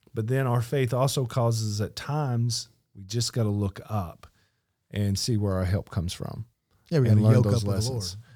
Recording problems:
none

